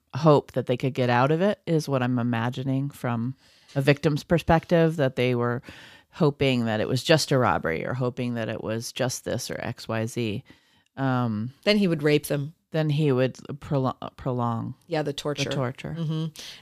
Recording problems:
none

